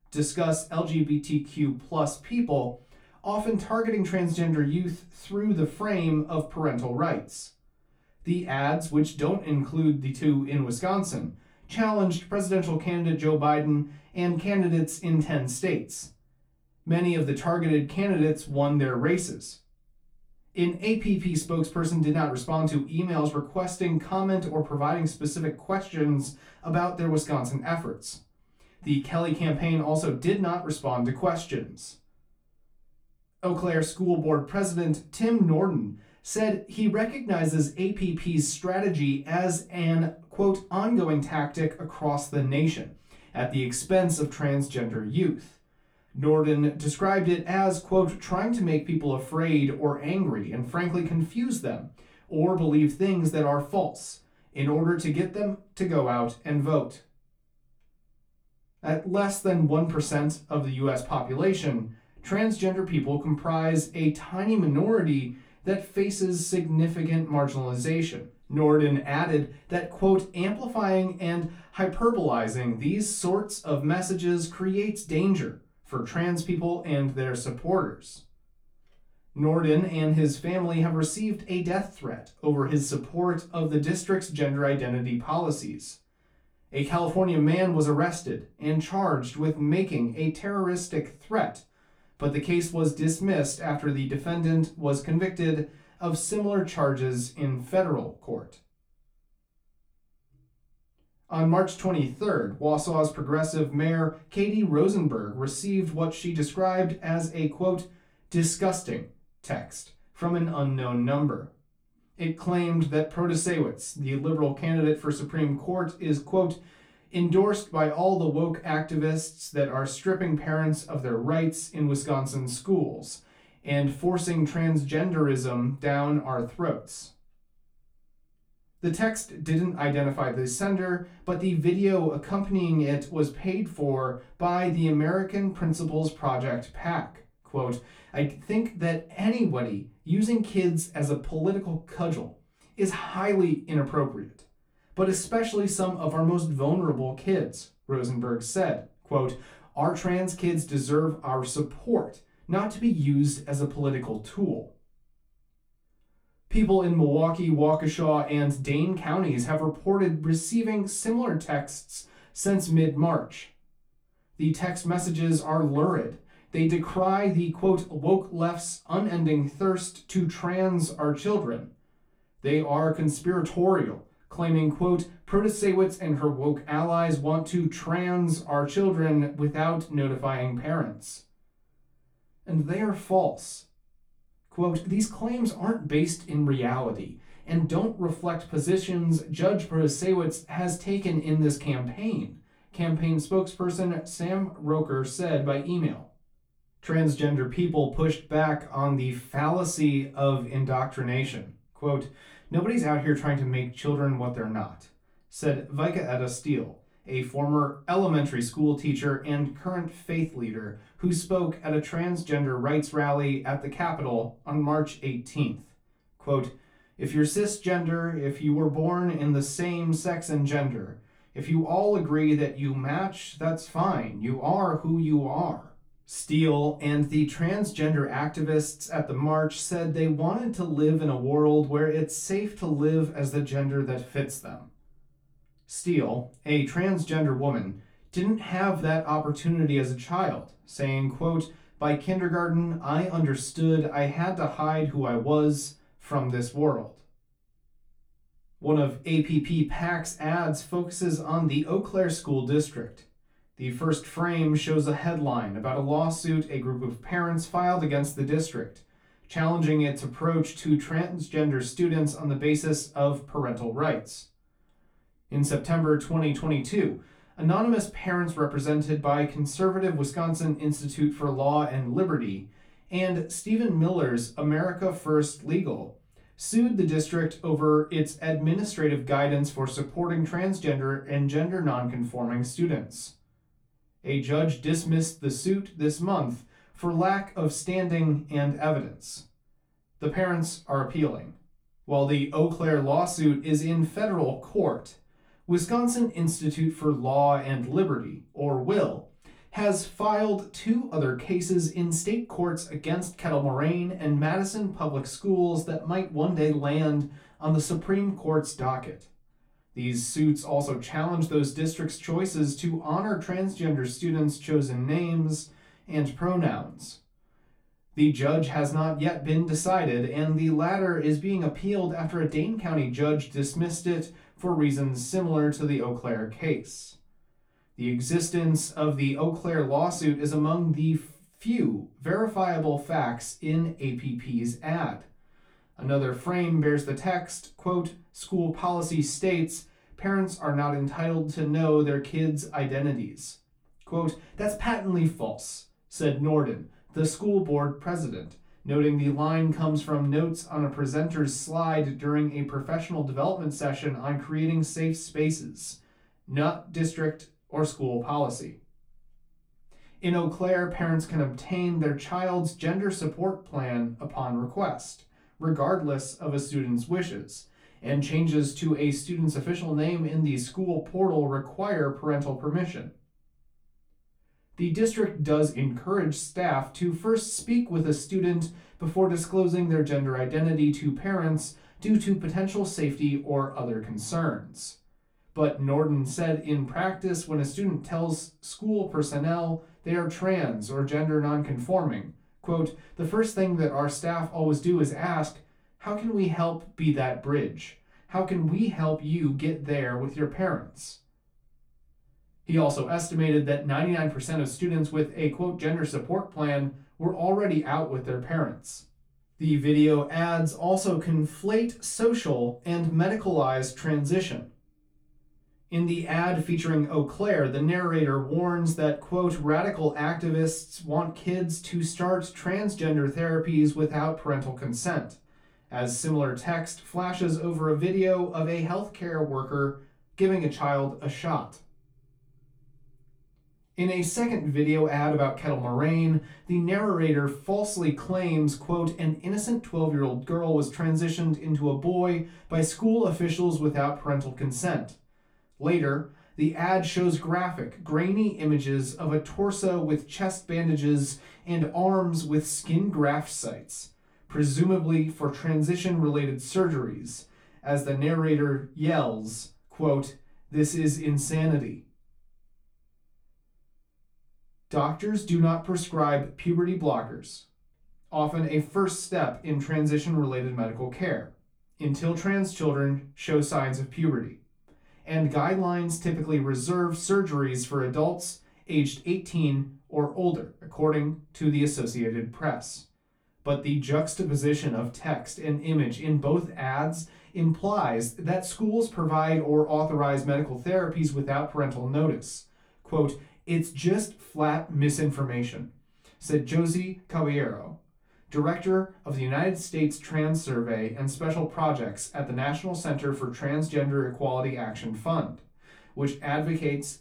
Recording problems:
off-mic speech; far
room echo; very slight; dies away in 0.2 s

